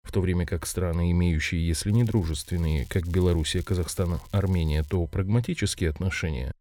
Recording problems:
crackling; faint; from 2 to 5 s; 25 dB below the speech

